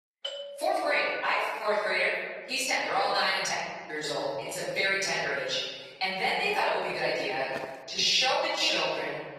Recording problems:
room echo; strong; dies away in 1.5 s
off-mic speech; far
thin; somewhat; fading below 450 Hz
garbled, watery; slightly; nothing above 14.5 kHz
doorbell; noticeable; at the start; peak 8 dB below the speech
uneven, jittery; strongly; from 0.5 to 9 s
footsteps; faint; at 7.5 s; peak 15 dB below the speech

